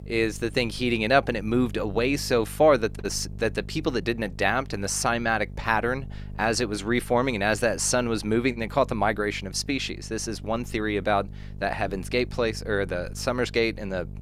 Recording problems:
electrical hum; faint; throughout; 50 Hz, 25 dB below the speech

